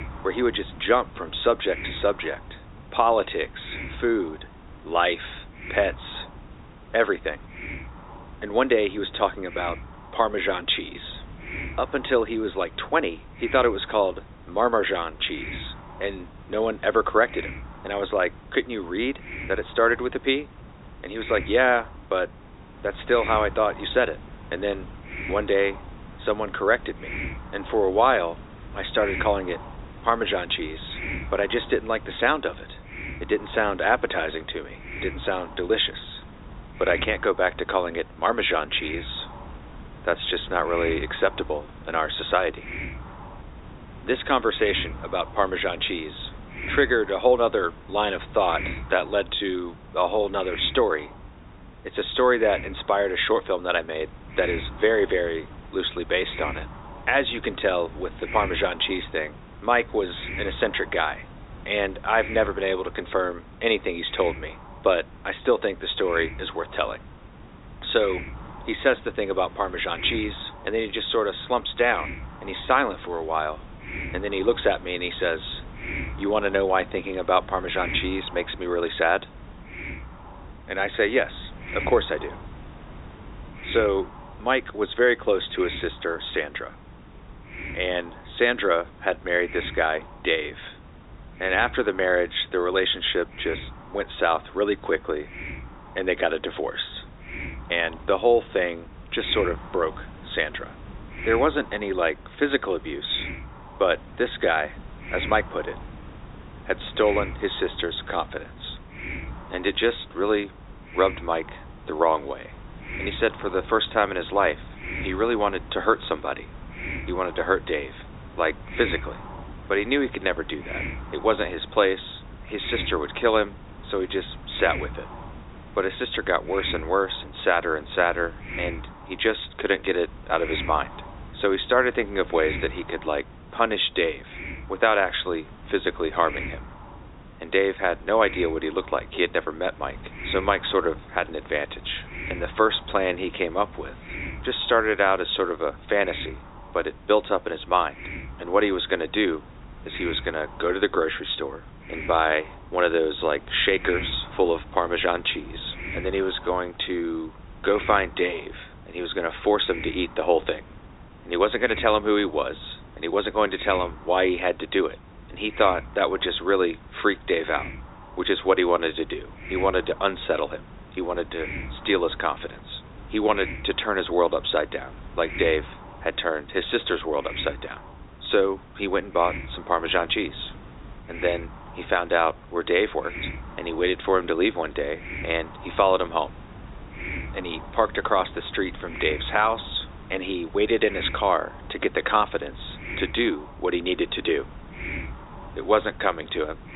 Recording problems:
high frequencies cut off; severe; nothing above 4 kHz
thin; somewhat; fading below 300 Hz
muffled; very slightly; fading above 2 kHz
hiss; noticeable; throughout; 15 dB below the speech

